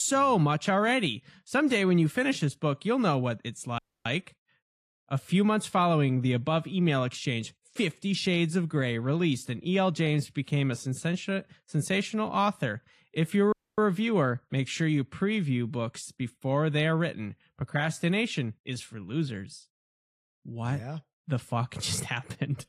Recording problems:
garbled, watery; slightly
abrupt cut into speech; at the start
audio cutting out; at 4 s and at 14 s

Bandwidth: 15 kHz